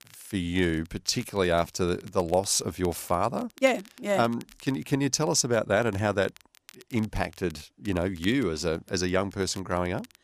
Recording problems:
crackle, like an old record; faint; 25 dB below the speech

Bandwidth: 14.5 kHz